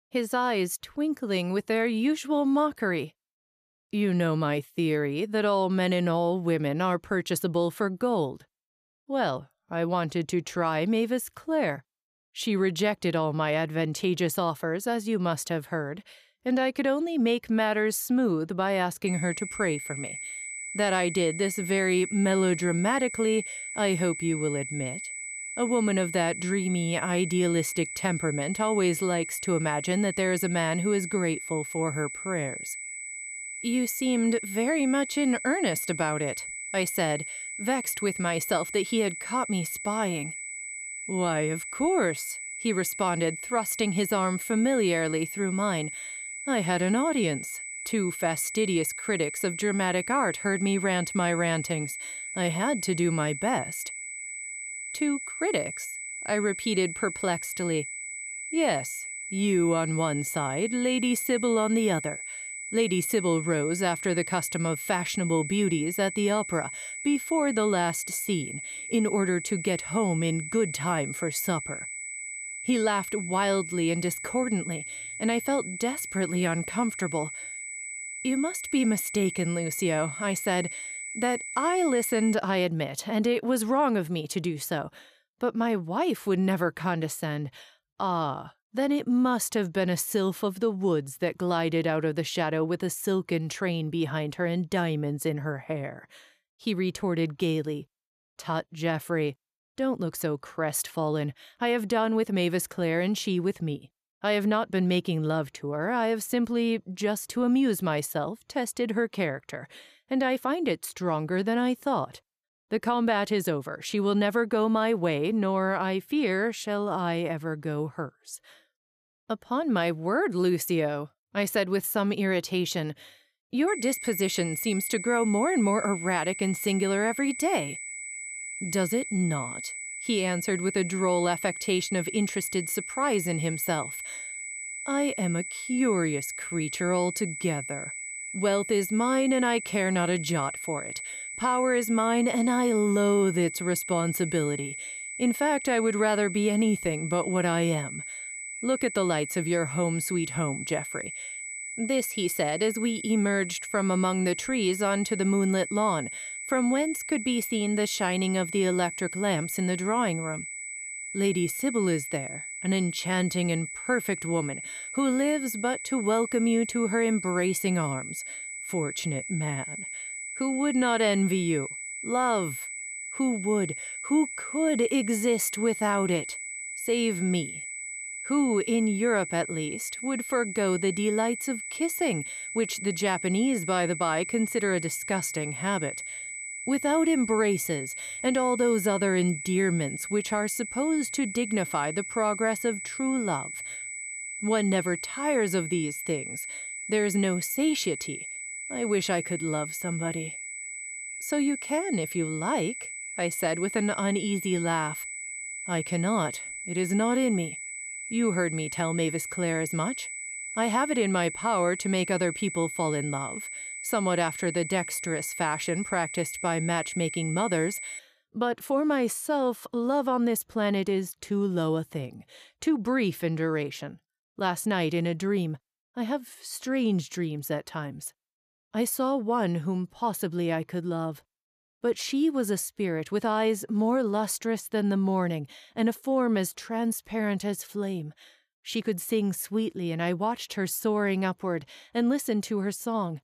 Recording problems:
high-pitched whine; loud; from 19 s to 1:22 and from 2:04 to 3:38; 2 kHz, 7 dB below the speech

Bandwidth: 14.5 kHz